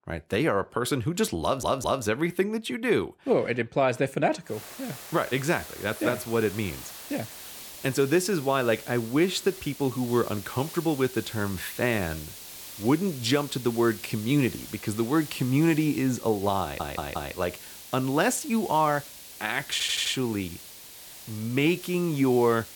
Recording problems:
hiss; noticeable; from 4.5 s on; 15 dB below the speech
audio stuttering; at 1.5 s, at 17 s and at 20 s

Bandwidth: 18.5 kHz